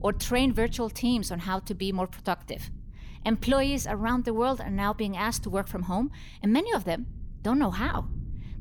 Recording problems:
low rumble; faint; throughout; 25 dB below the speech

